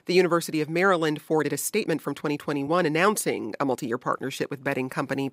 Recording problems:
uneven, jittery; strongly; from 1.5 to 4.5 s

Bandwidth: 15.5 kHz